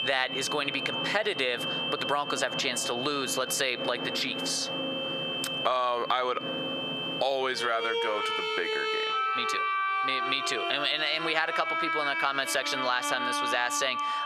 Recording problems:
squashed, flat; heavily, background pumping
thin; somewhat; fading below 550 Hz
high-pitched whine; loud; throughout; 3 kHz, 7 dB below the speech
background music; loud; throughout; 3 dB below the speech

